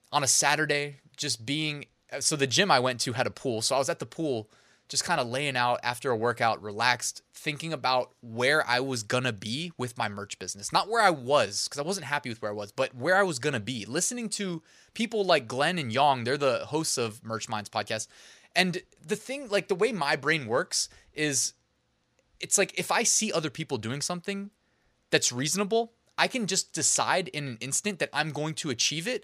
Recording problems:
none

